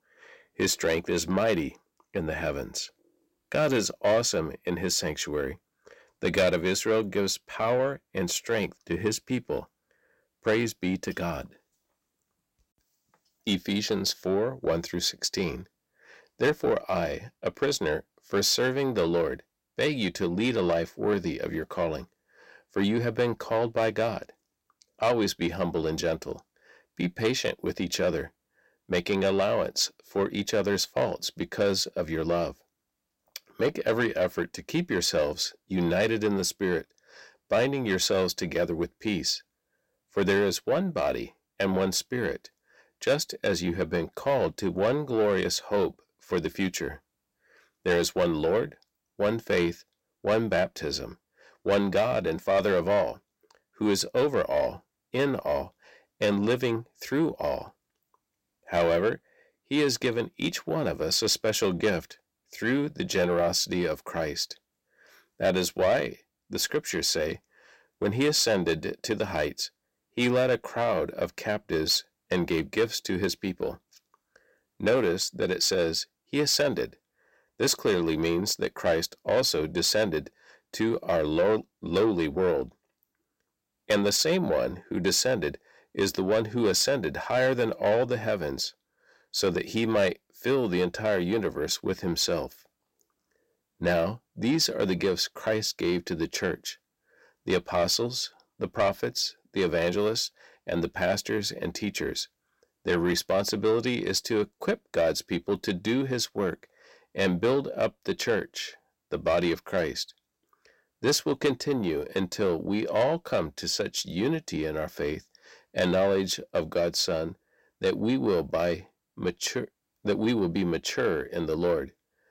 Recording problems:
distortion; slight; 10 dB below the speech

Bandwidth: 16 kHz